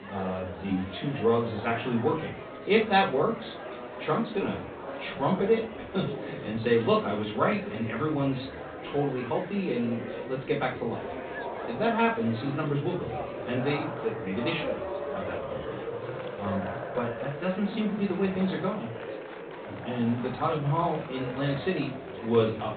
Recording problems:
off-mic speech; far
high frequencies cut off; severe; nothing above 4 kHz
room echo; slight; dies away in 0.3 s
murmuring crowd; loud; throughout; 9 dB below the speech

